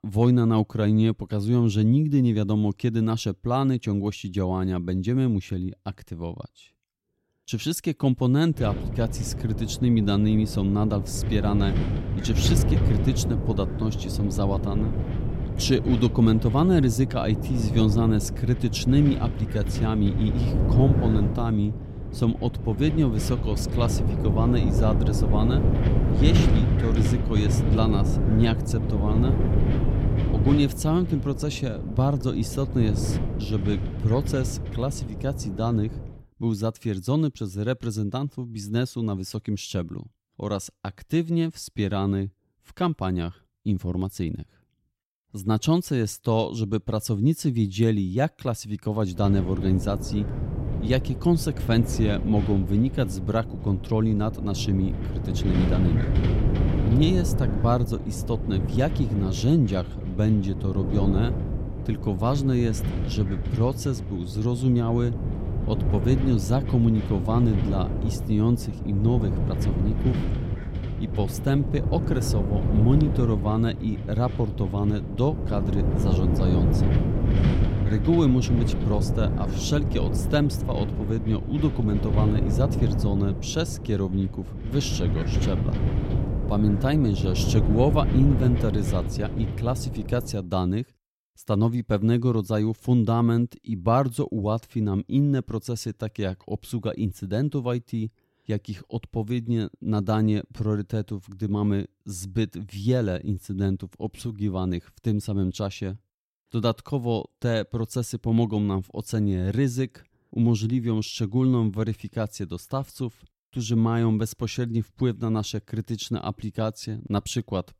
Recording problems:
wind noise on the microphone; heavy; from 8.5 to 36 s and from 49 s to 1:30; 6 dB below the speech

